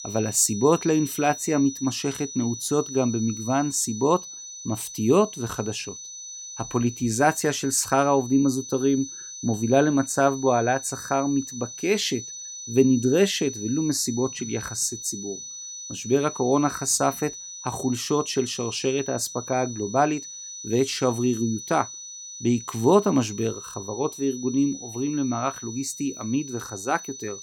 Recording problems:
high-pitched whine; noticeable; throughout; 6 kHz, 10 dB below the speech

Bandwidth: 17 kHz